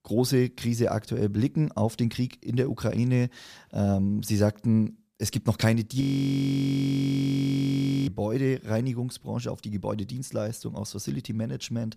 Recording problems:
audio freezing; at 6 s for 2 s

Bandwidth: 14.5 kHz